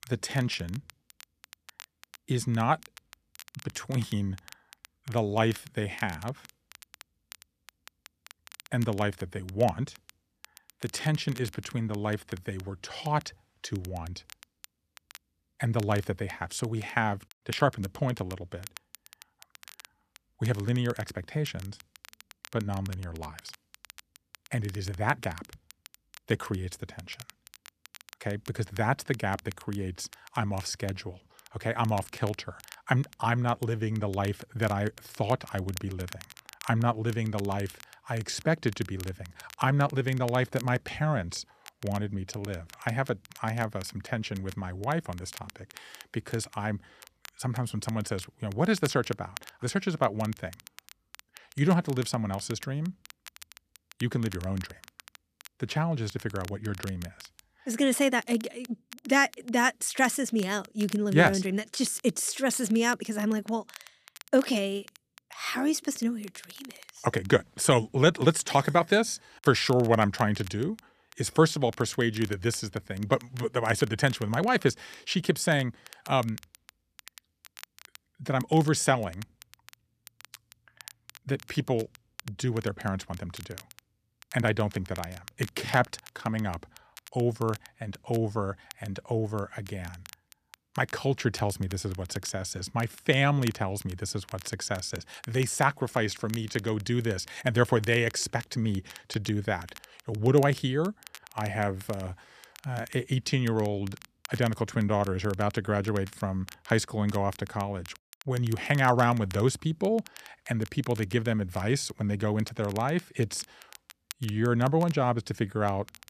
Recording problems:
crackle, like an old record; faint; 20 dB below the speech

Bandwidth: 14.5 kHz